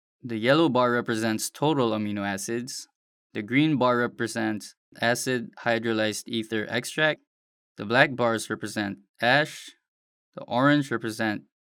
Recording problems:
none

